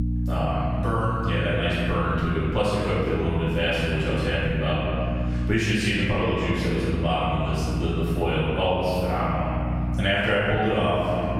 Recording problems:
room echo; strong; dies away in 1.8 s
off-mic speech; far
squashed, flat; somewhat
electrical hum; noticeable; throughout; 60 Hz, 15 dB below the speech

